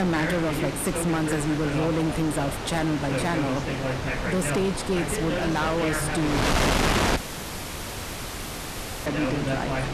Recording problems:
distortion; heavy; 20% of the sound clipped
wind noise on the microphone; heavy; as loud as the speech
voice in the background; loud; throughout; 4 dB below the speech
abrupt cut into speech; at the start
audio cutting out; at 7 s for 2 s

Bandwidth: 13.5 kHz